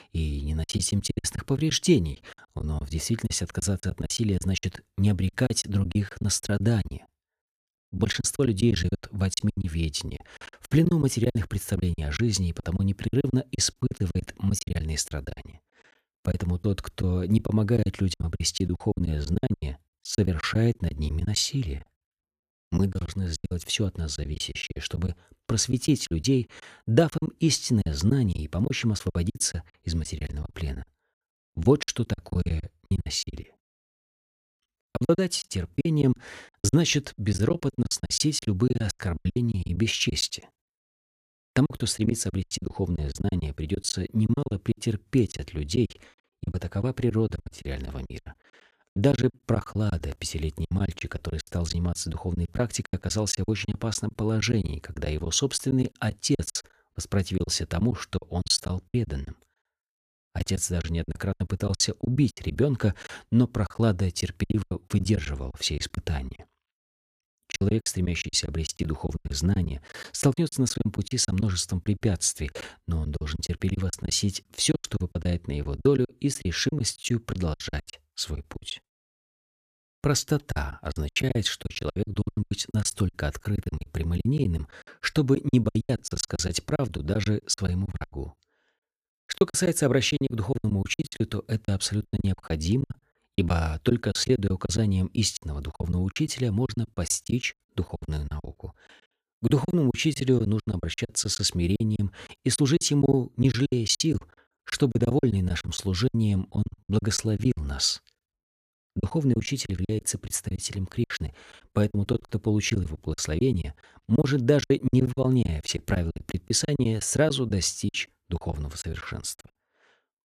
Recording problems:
choppy; very; 17% of the speech affected

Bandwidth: 14.5 kHz